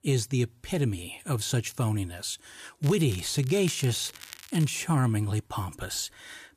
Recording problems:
crackling; noticeable; from 3 to 4.5 s; 15 dB below the speech

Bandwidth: 14.5 kHz